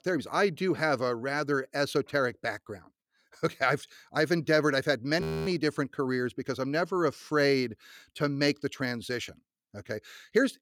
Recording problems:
audio freezing; at 5 s

